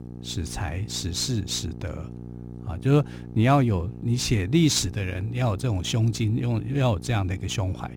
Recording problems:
electrical hum; noticeable; throughout; 60 Hz, 20 dB below the speech

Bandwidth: 17.5 kHz